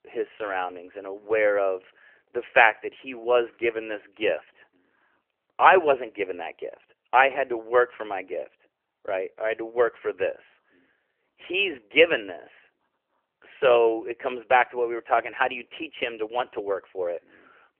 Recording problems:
phone-call audio; nothing above 3 kHz

